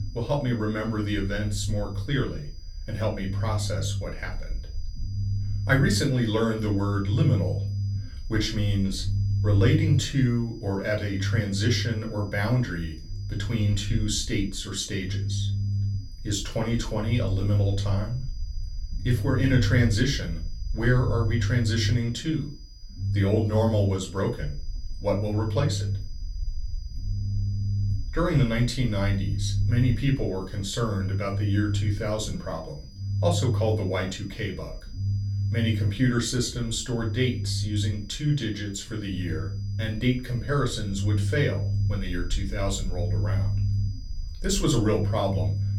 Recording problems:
off-mic speech; far
room echo; very slight; dies away in 0.3 s
low rumble; noticeable; throughout; 15 dB below the speech
high-pitched whine; faint; throughout; 5 kHz, 25 dB below the speech

